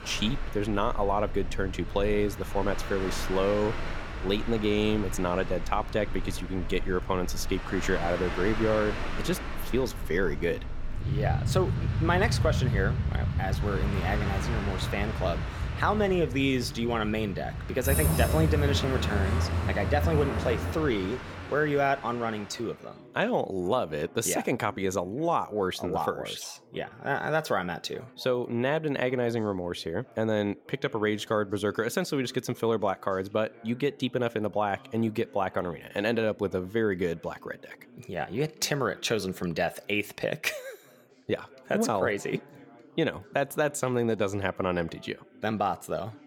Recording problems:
train or aircraft noise; loud; until 22 s; 3 dB below the speech
background chatter; faint; throughout; 3 voices, 25 dB below the speech

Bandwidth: 17 kHz